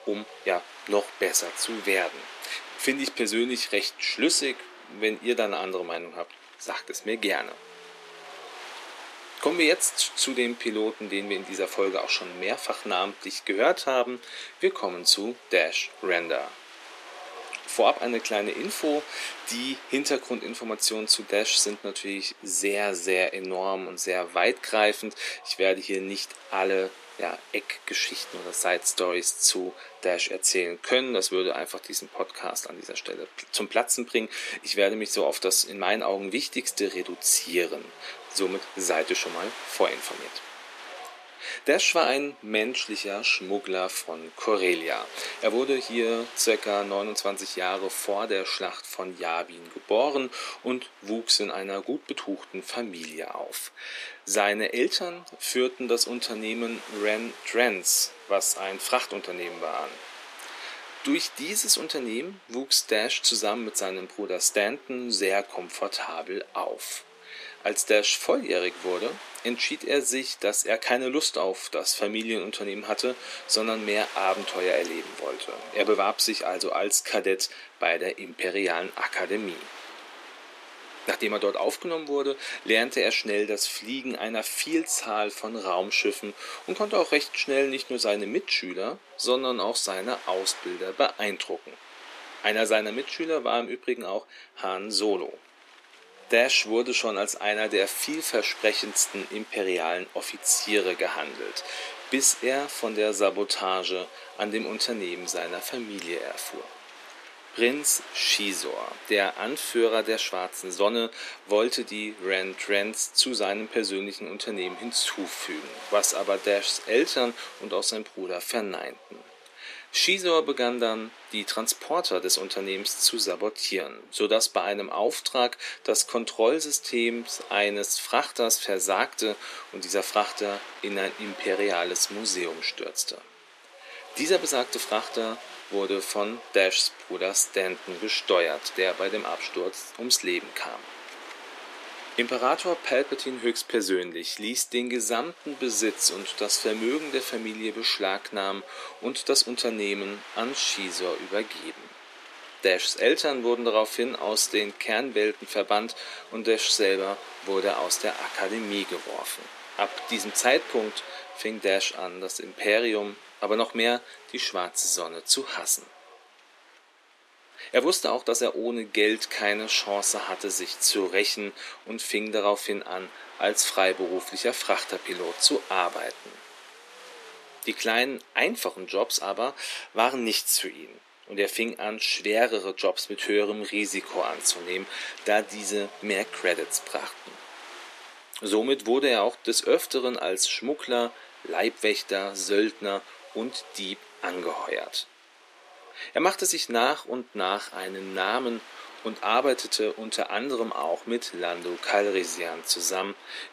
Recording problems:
thin; somewhat; fading below 300 Hz
wind noise on the microphone; occasional gusts; 15 dB below the speech

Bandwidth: 14.5 kHz